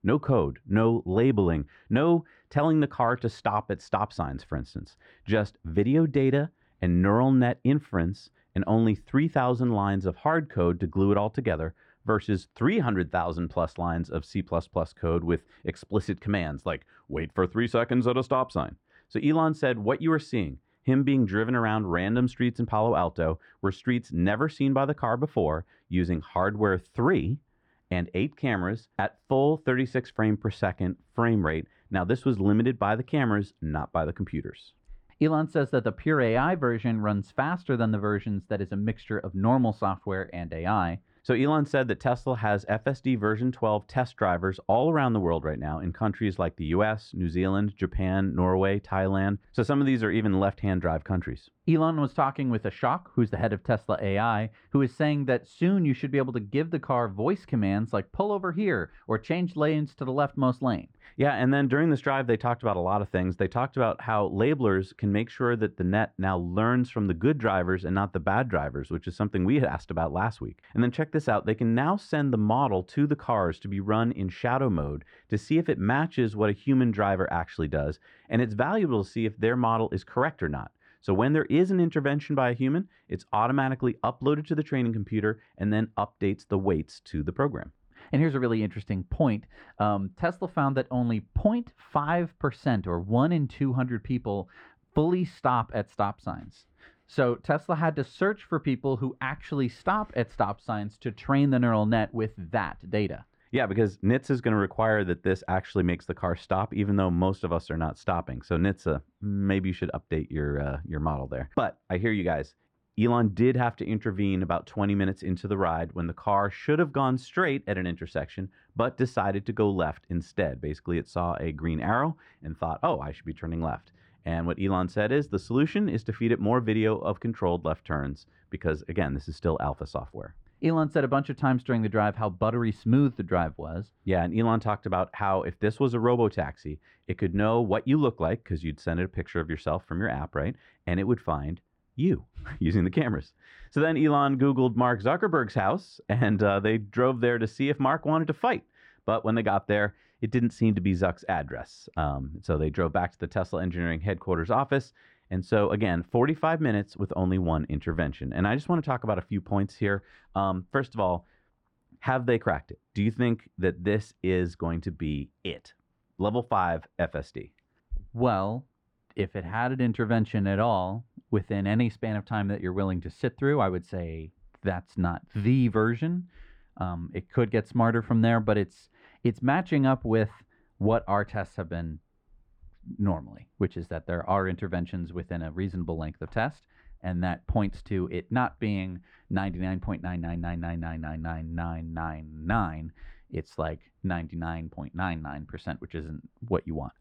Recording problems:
muffled; very; fading above 3 kHz

